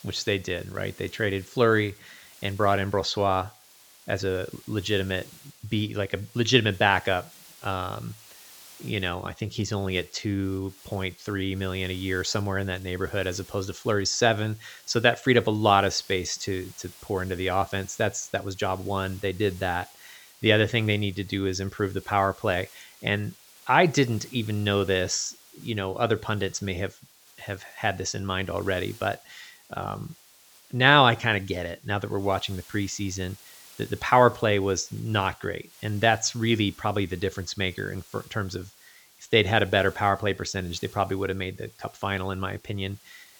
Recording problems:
high frequencies cut off; noticeable; nothing above 8 kHz
hiss; faint; throughout; 25 dB below the speech

